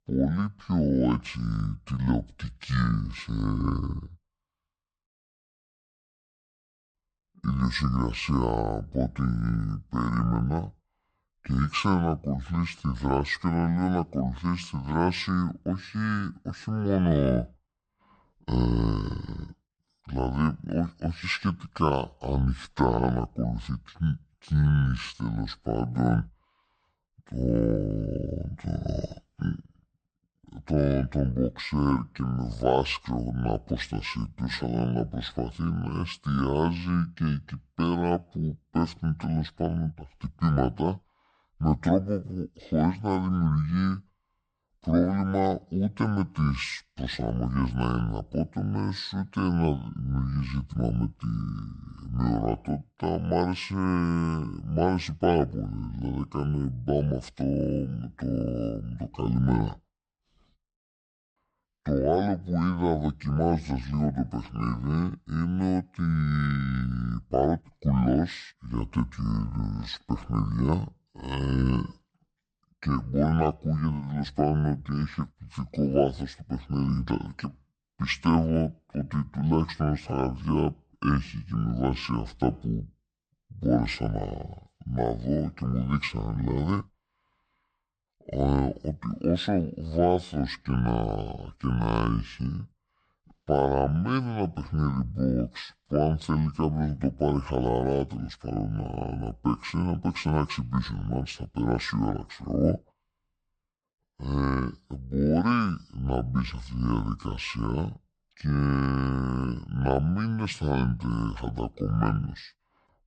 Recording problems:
wrong speed and pitch; too slow and too low; 0.6 times normal speed

